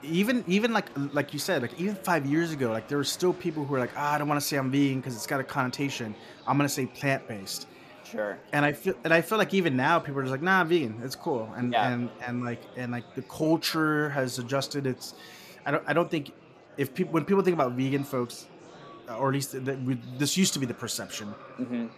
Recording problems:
murmuring crowd; faint; throughout; 20 dB below the speech

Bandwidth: 14.5 kHz